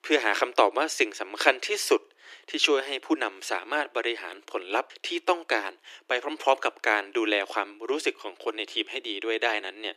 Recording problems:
thin; very; fading below 300 Hz

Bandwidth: 14.5 kHz